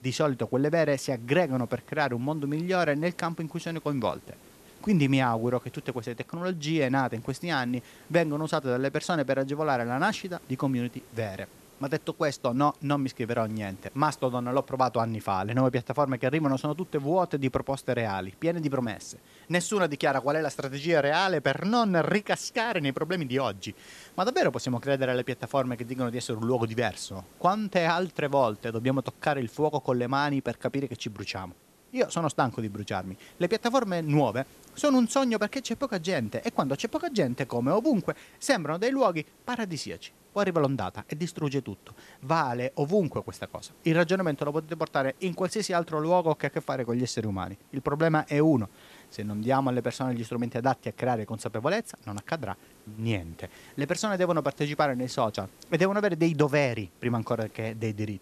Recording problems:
hiss; faint; throughout; 25 dB below the speech

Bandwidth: 13.5 kHz